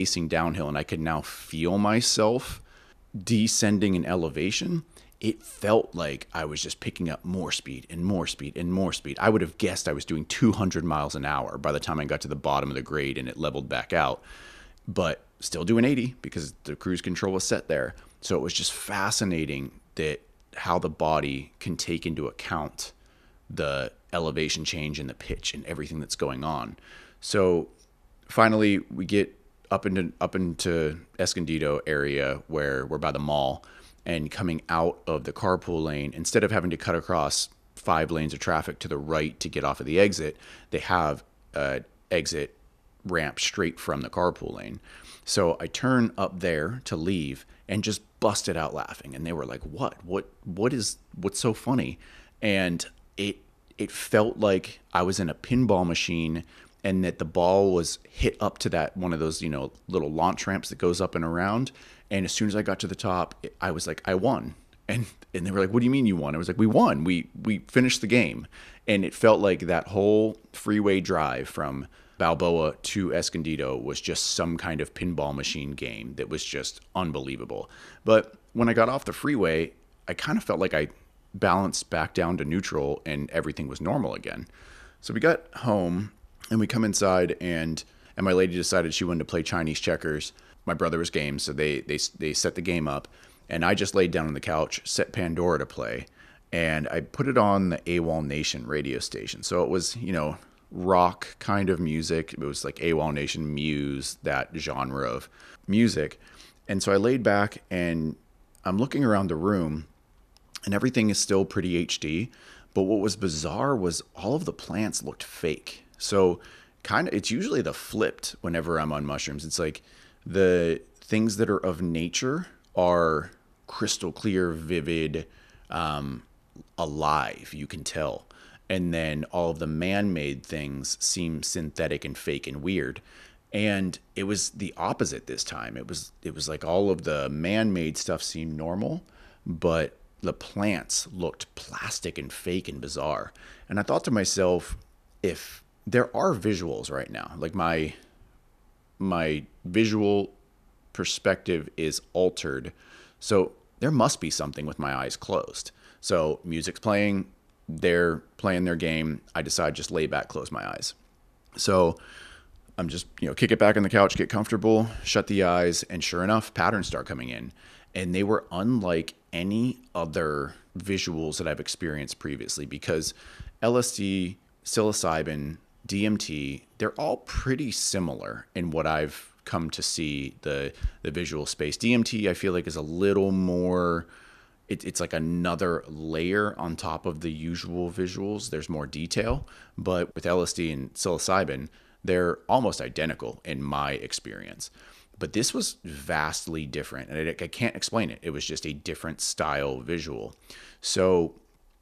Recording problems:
abrupt cut into speech; at the start

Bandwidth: 14.5 kHz